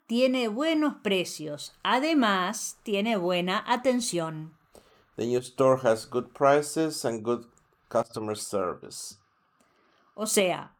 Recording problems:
none

